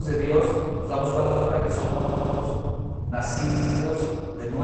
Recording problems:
room echo; strong; dies away in 1.8 s
off-mic speech; far
garbled, watery; badly; nothing above 8 kHz
low rumble; noticeable; throughout; 15 dB below the speech
abrupt cut into speech; at the start and the end
audio stuttering; at 1 s, at 2 s and at 3.5 s

